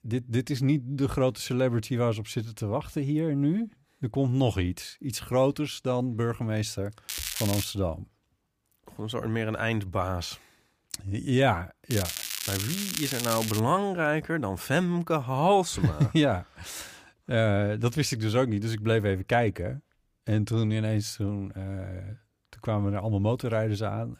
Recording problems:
crackling; loud; at 7 s and from 12 to 14 s; 4 dB below the speech

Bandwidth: 15 kHz